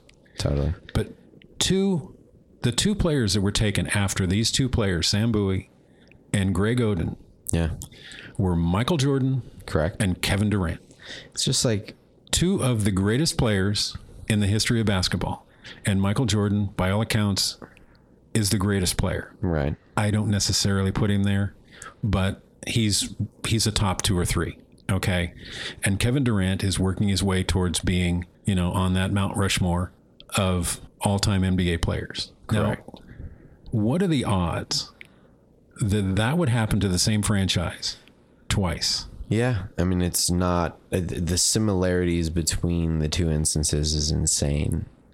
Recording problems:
squashed, flat; heavily

